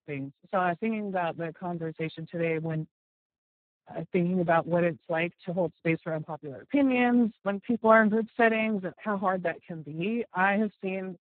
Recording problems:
garbled, watery; badly
high frequencies cut off; severe; nothing above 4 kHz

